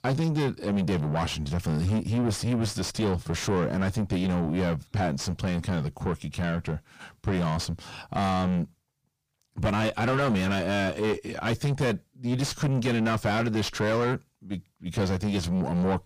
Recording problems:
distortion; heavy; 4 dB below the speech

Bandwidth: 15 kHz